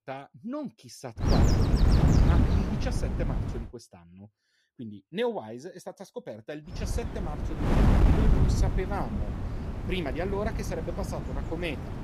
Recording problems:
wind noise on the microphone; heavy; from 1.5 to 3.5 s and from 6.5 s on; 1 dB above the speech

